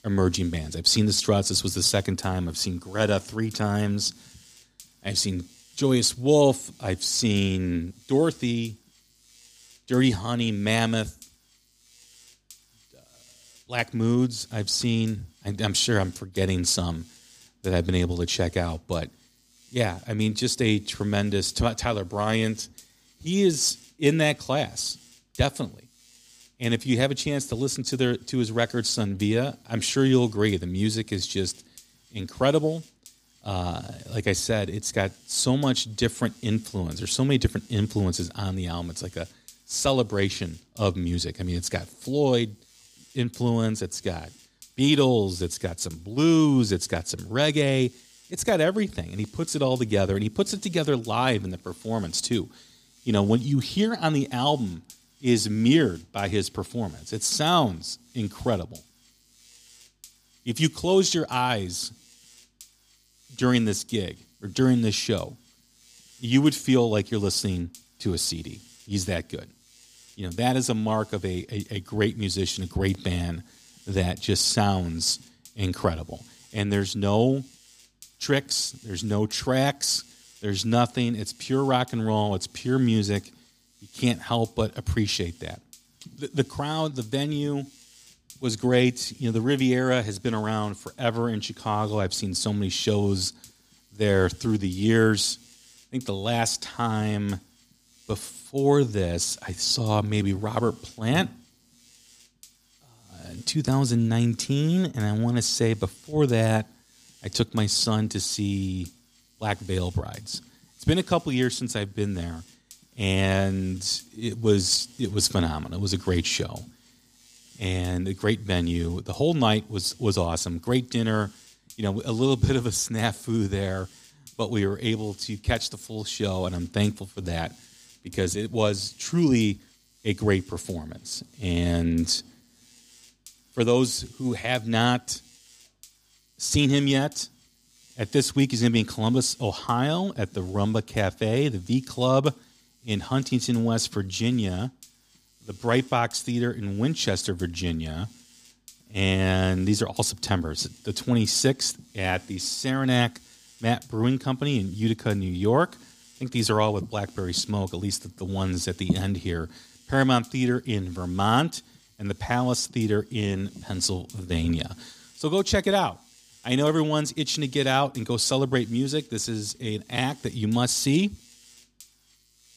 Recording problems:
electrical hum; faint; throughout; 50 Hz, 25 dB below the speech

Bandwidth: 15 kHz